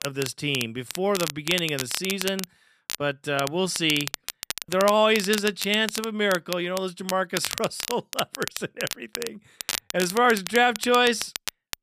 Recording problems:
crackle, like an old record; loud; 8 dB below the speech

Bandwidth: 14.5 kHz